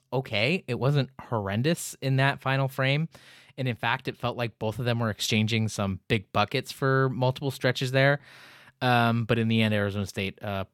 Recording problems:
none

